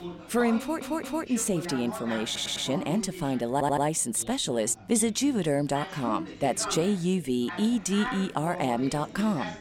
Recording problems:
background chatter; noticeable; throughout; 3 voices, 10 dB below the speech
audio stuttering; at 0.5 s, at 2.5 s and at 3.5 s

